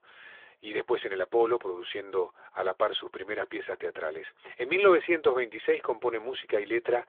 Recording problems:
phone-call audio; nothing above 3.5 kHz

